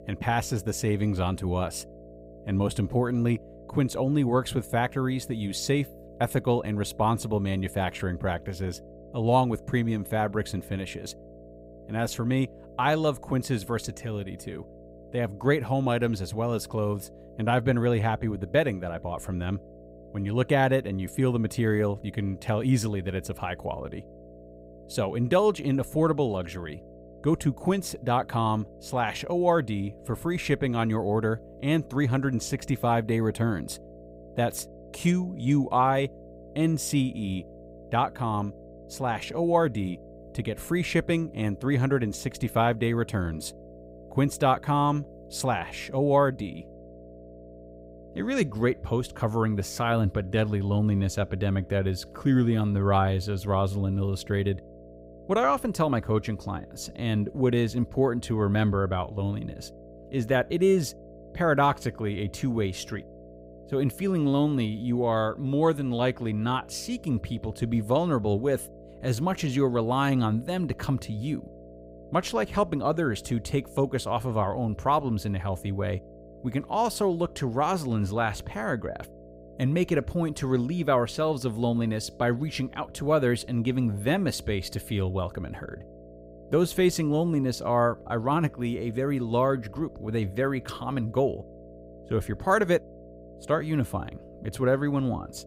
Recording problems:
electrical hum; faint; throughout; 60 Hz, 20 dB below the speech

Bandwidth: 15.5 kHz